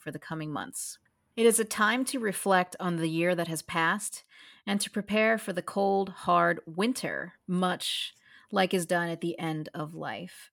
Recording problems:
none

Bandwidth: 17.5 kHz